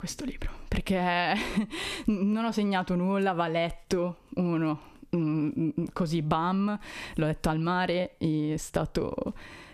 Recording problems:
squashed, flat; heavily

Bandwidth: 14.5 kHz